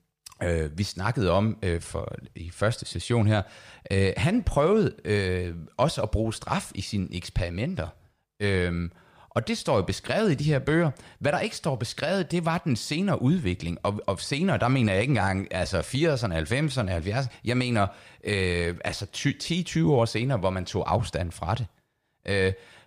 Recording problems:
none

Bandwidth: 15 kHz